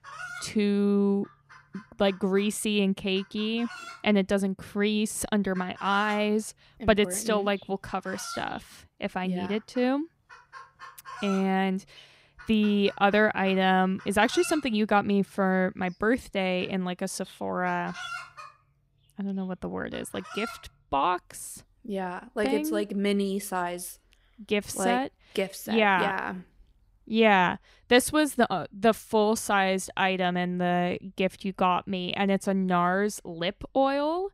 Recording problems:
animal sounds; noticeable; throughout; 15 dB below the speech

